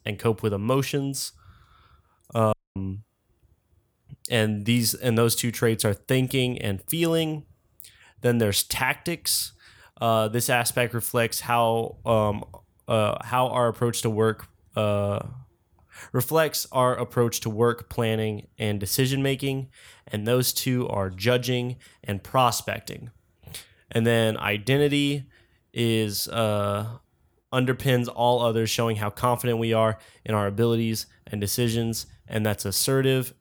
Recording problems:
audio cutting out; at 2.5 s

